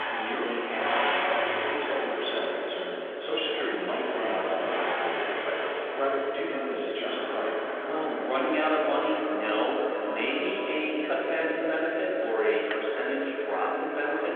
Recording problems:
echo of what is said; strong; throughout; 510 ms later, 5 dB below the speech
room echo; strong; dies away in 1.9 s
off-mic speech; far
phone-call audio; nothing above 3.5 kHz
traffic noise; loud; throughout; 2 dB below the speech

